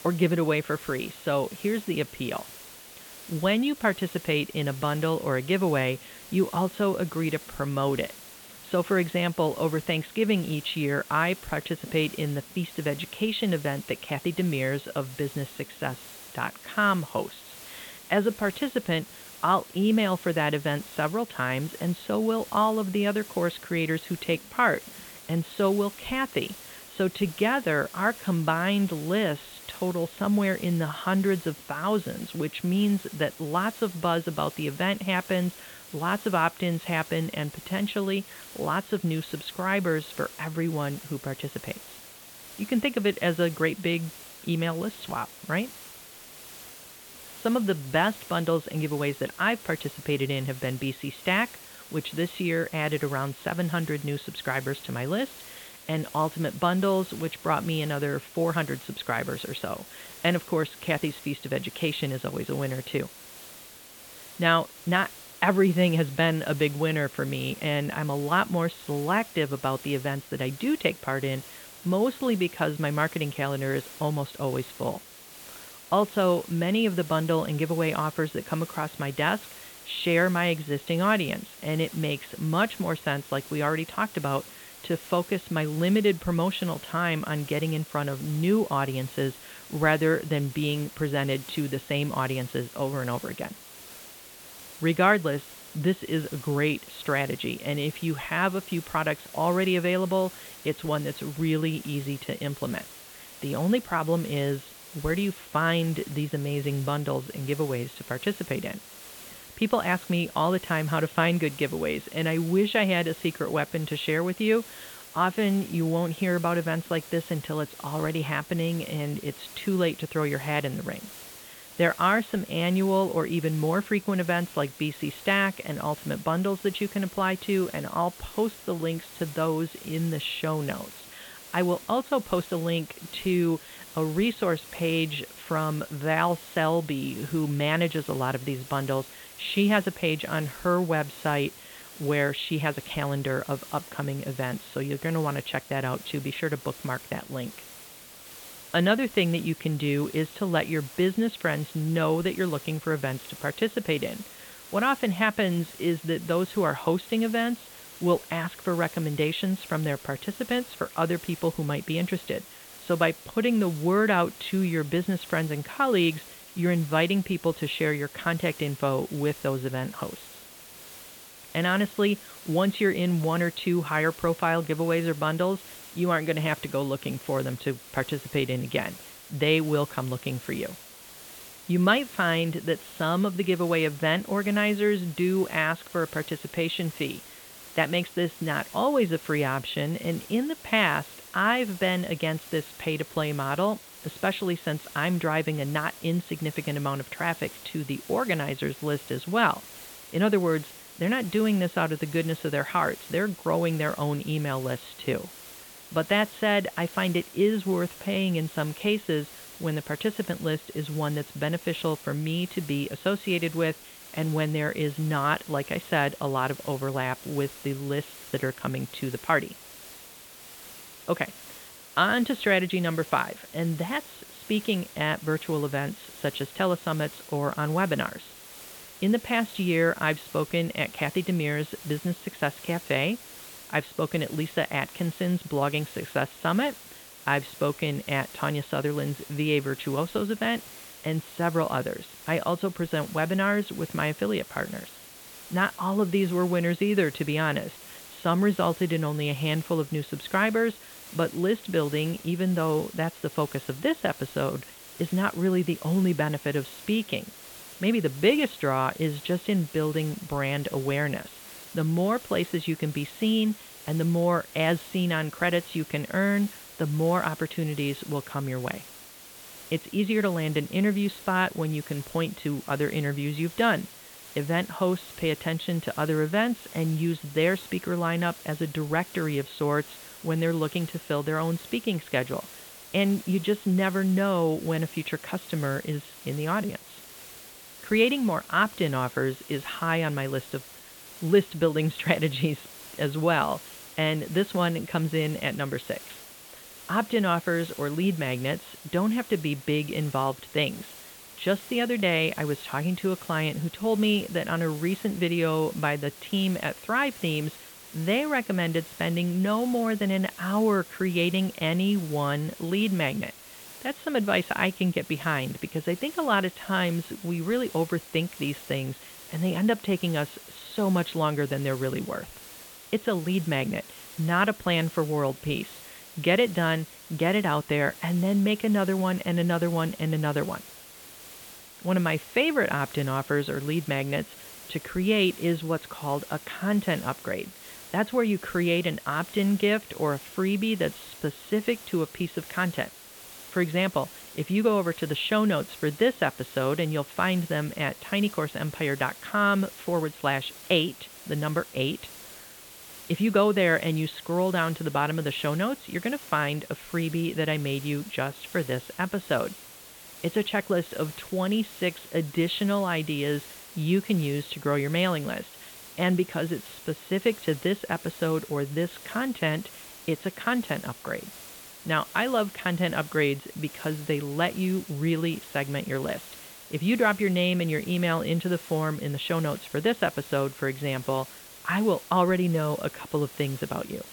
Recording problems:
high frequencies cut off; severe; nothing above 4 kHz
hiss; noticeable; throughout; 15 dB below the speech

